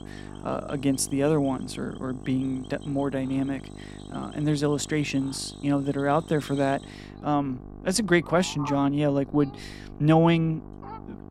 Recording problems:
electrical hum; noticeable; throughout; 50 Hz, 20 dB below the speech
animal sounds; faint; throughout; 20 dB below the speech

